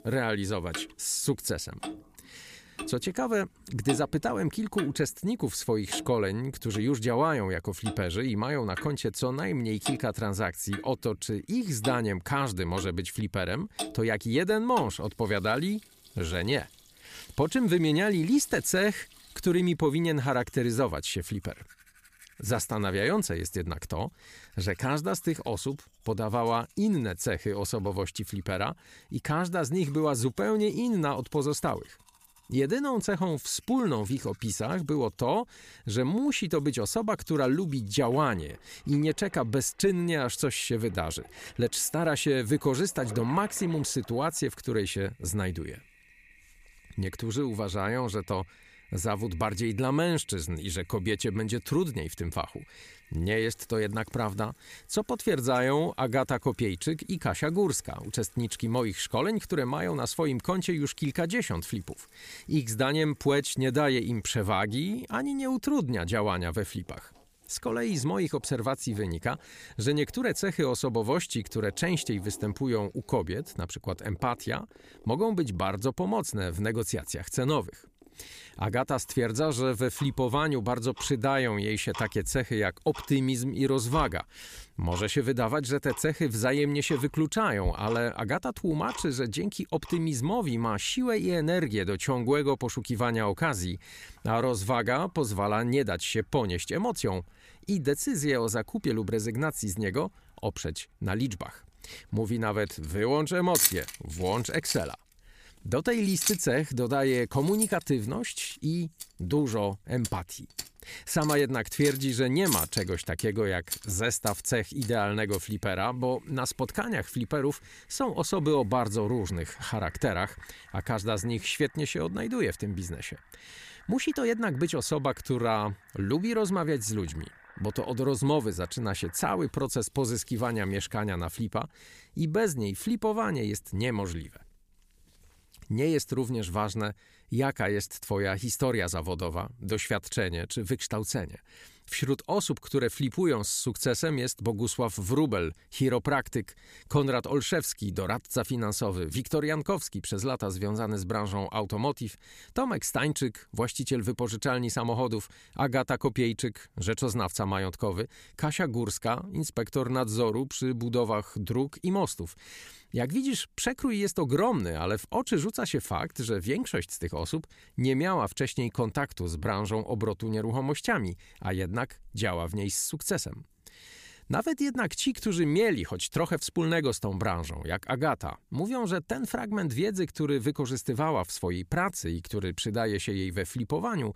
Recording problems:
household noises; loud; until 2:11; 9 dB below the speech

